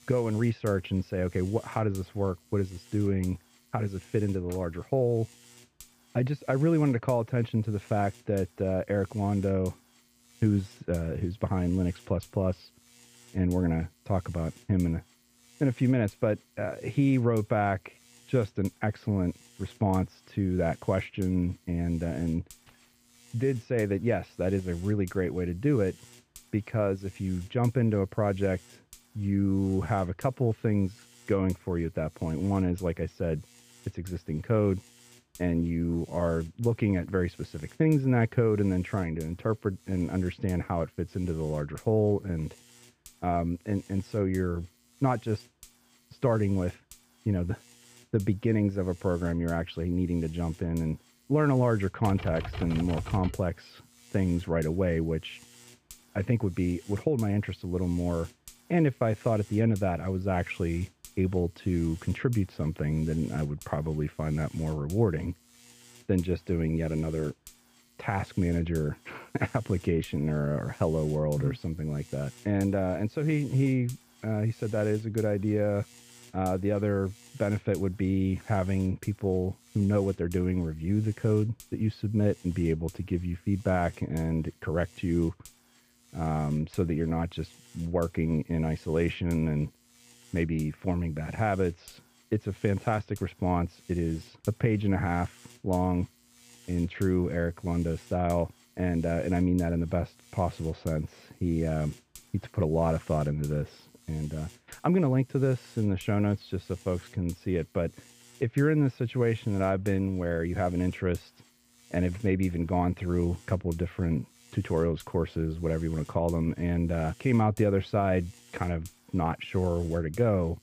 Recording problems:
muffled; very; fading above 2.5 kHz
electrical hum; faint; throughout; 50 Hz, 25 dB below the speech
jangling keys; very faint; at 23 s; peak 30 dB below the speech
keyboard typing; noticeable; from 52 to 53 s; peak 8 dB below the speech

